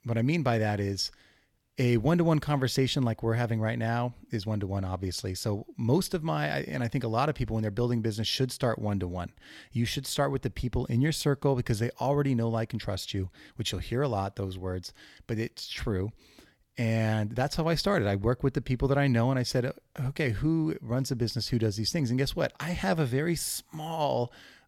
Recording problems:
none

